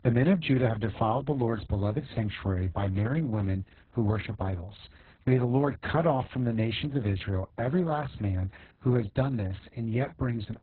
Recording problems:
garbled, watery; badly; nothing above 4 kHz

